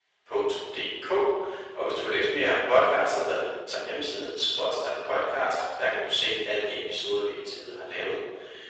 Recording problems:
room echo; strong; dies away in 1.1 s
off-mic speech; far
thin; very; fading below 350 Hz
garbled, watery; slightly; nothing above 8 kHz
uneven, jittery; slightly; from 3.5 to 7.5 s

